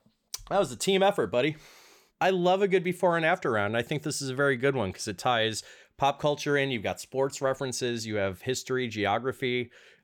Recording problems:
none

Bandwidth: 18.5 kHz